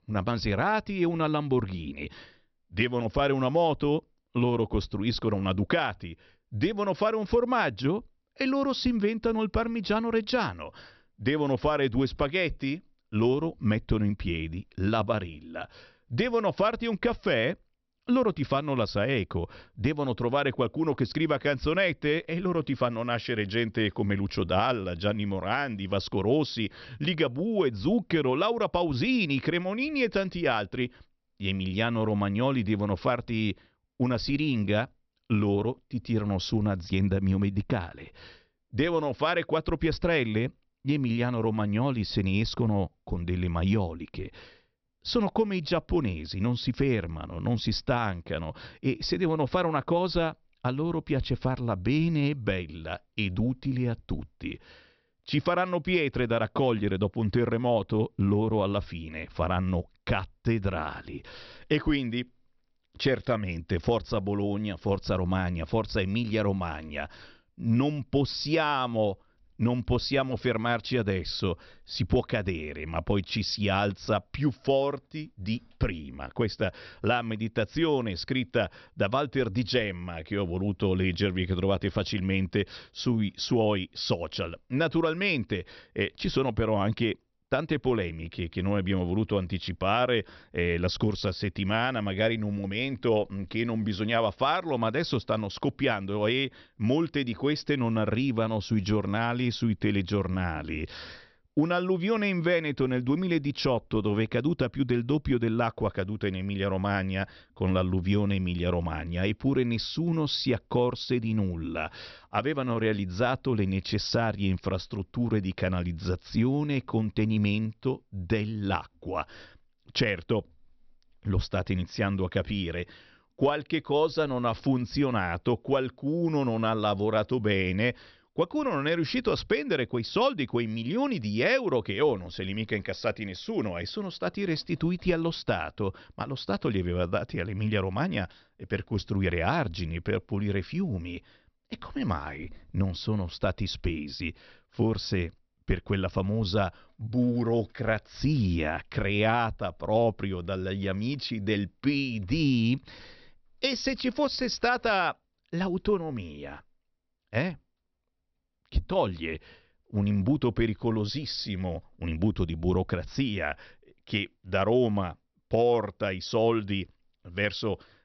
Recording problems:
high frequencies cut off; noticeable; nothing above 5.5 kHz

